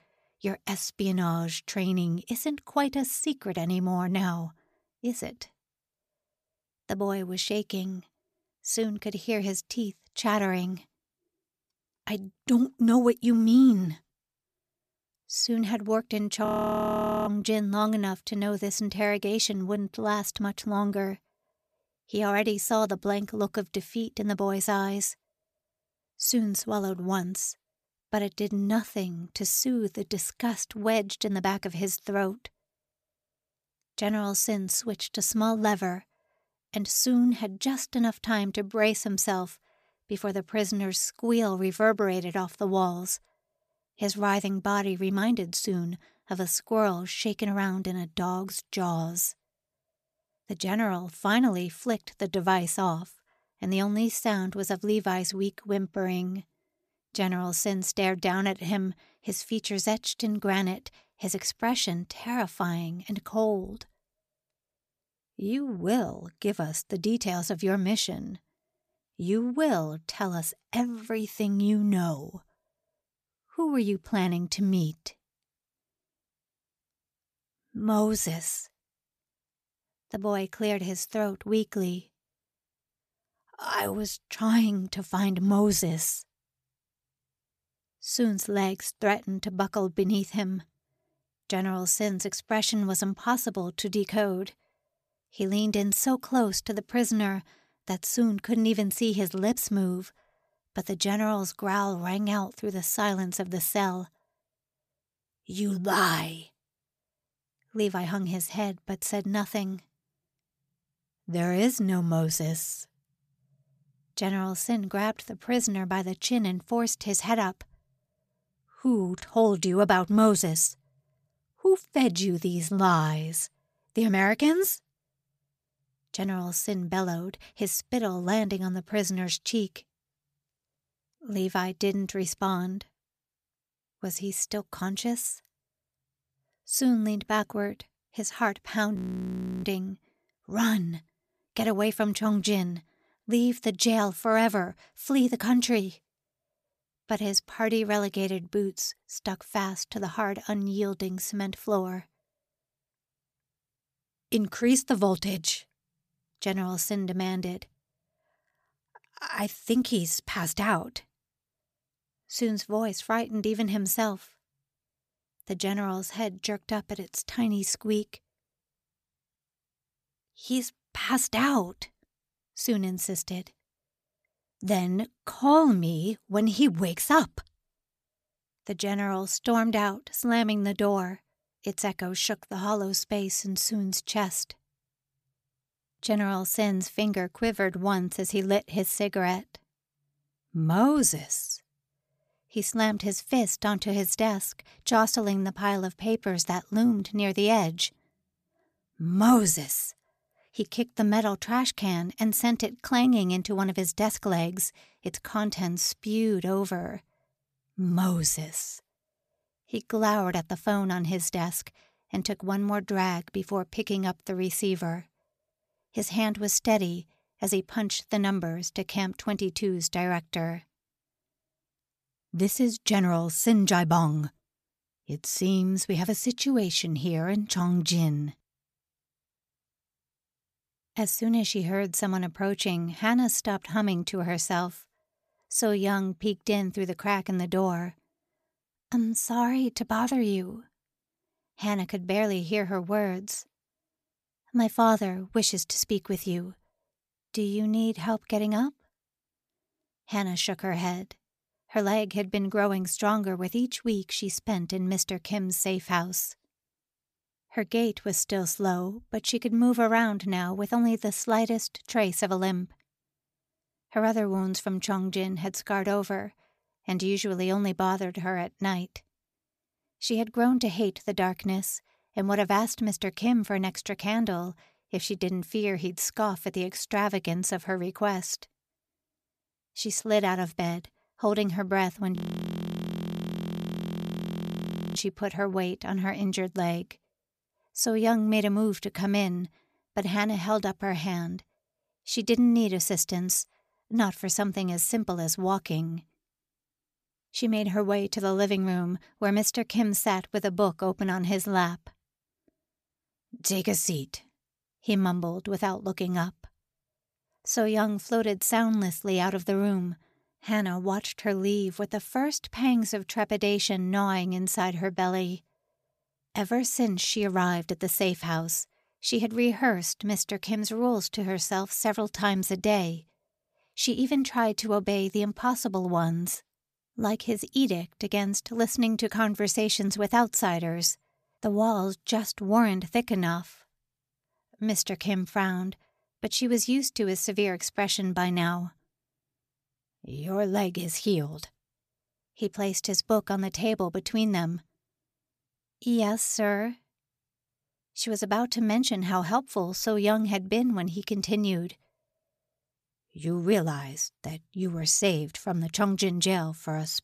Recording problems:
audio freezing; at 16 s for 1 s, at 2:19 for 0.5 s and at 4:42 for 3 s

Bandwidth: 14.5 kHz